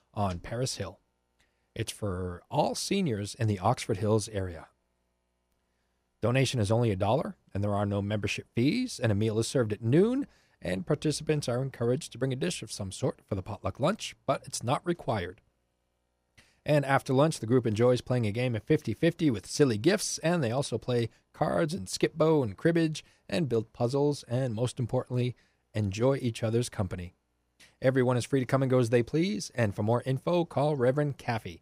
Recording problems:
none

